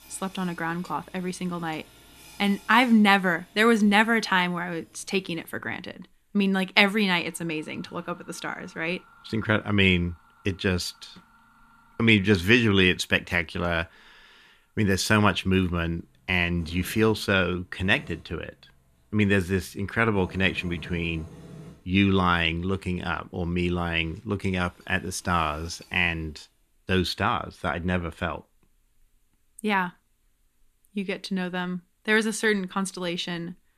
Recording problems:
machinery noise; faint; until 26 s; 25 dB below the speech

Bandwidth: 14.5 kHz